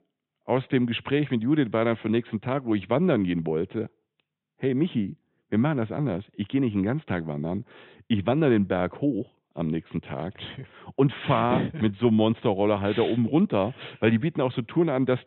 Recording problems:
high frequencies cut off; severe; nothing above 4 kHz

